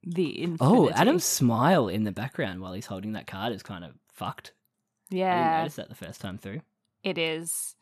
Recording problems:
none

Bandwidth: 13.5 kHz